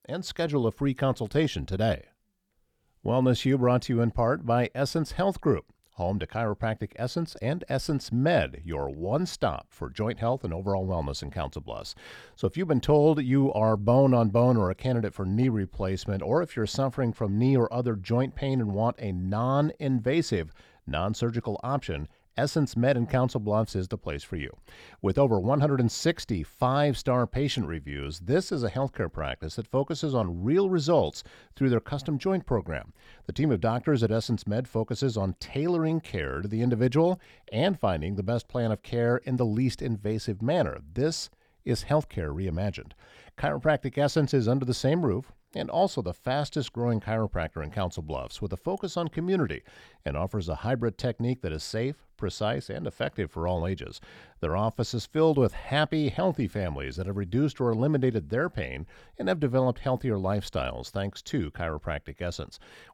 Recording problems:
none

